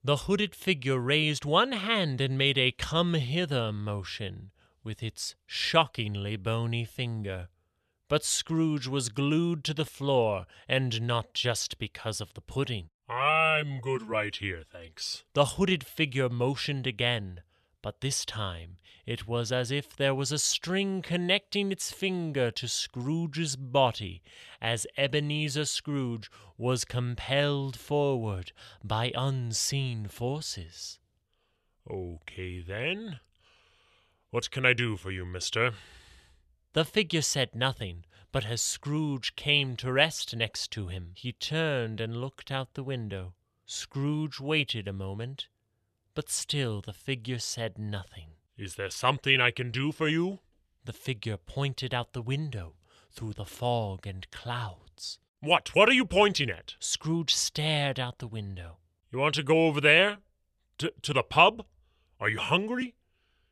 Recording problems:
none

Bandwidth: 13.5 kHz